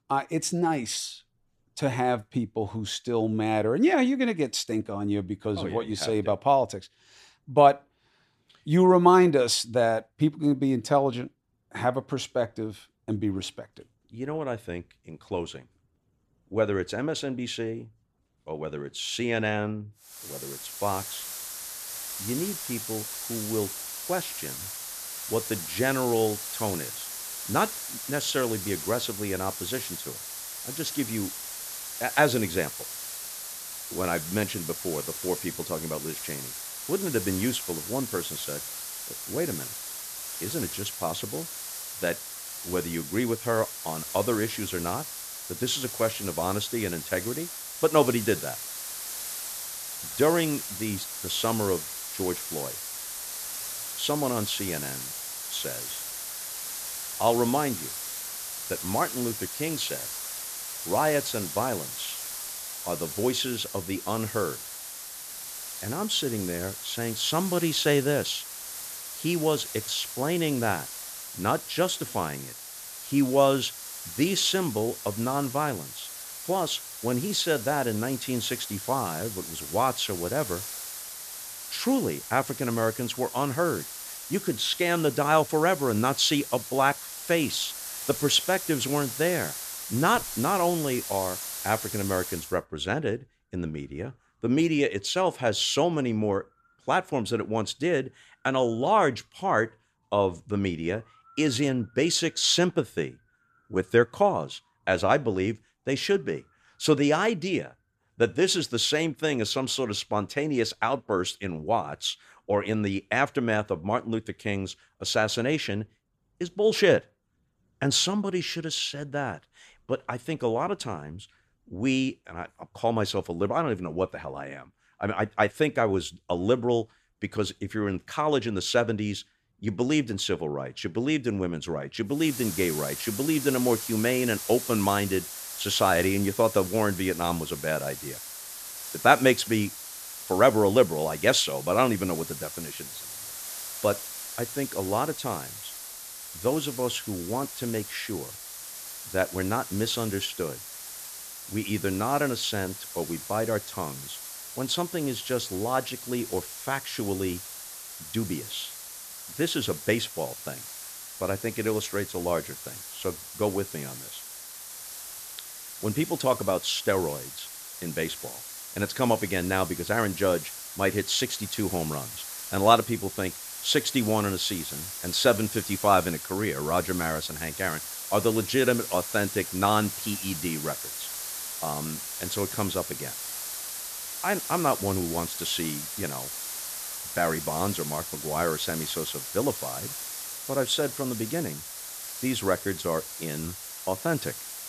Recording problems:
hiss; loud; from 20 s to 1:32 and from 2:12 on; 7 dB below the speech

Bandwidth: 14 kHz